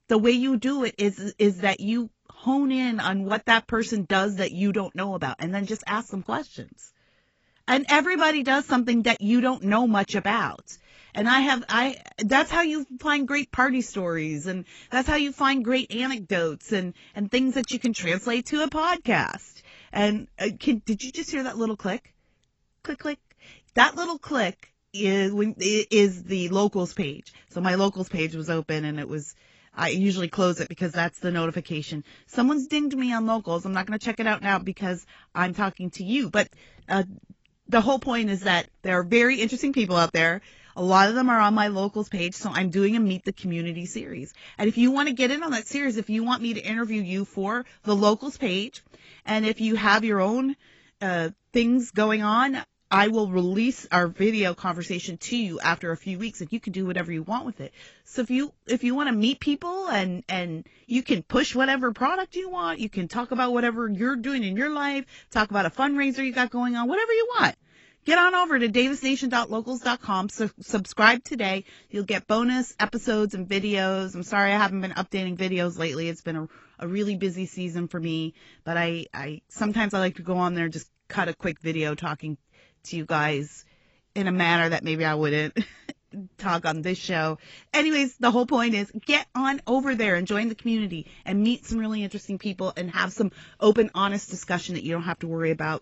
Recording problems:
garbled, watery; badly; nothing above 7.5 kHz

